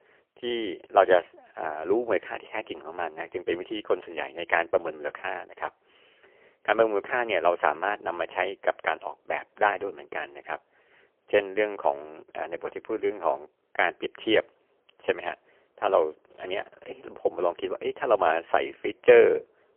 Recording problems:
phone-call audio; poor line; nothing above 3 kHz

